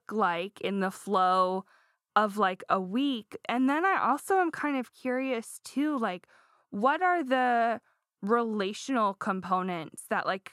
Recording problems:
muffled; slightly; fading above 2 kHz

